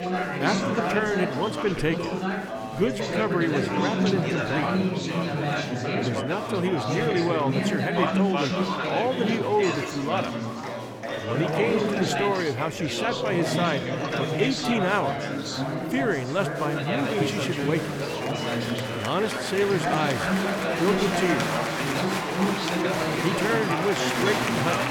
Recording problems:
chatter from many people; very loud; throughout; 1 dB above the speech

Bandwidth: 18.5 kHz